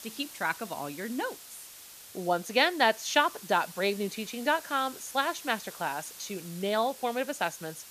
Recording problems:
hiss; noticeable; throughout; 15 dB below the speech

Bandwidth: 14.5 kHz